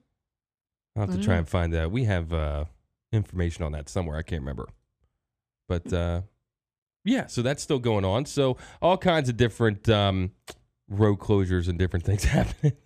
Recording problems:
none

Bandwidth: 14.5 kHz